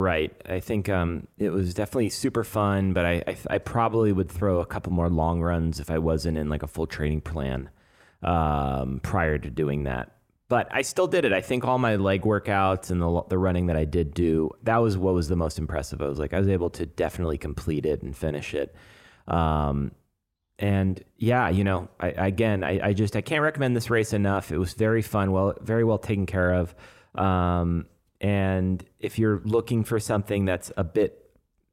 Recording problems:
abrupt cut into speech; at the start

